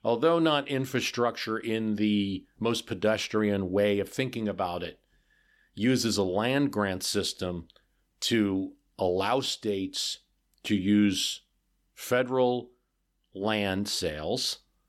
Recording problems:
none

